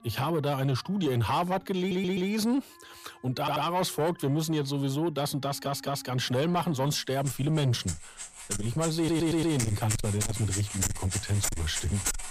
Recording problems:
distortion; heavy; 8 dB below the speech
background music; loud; throughout; 5 dB below the speech
audio stuttering; 4 times, first at 2 s

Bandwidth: 14.5 kHz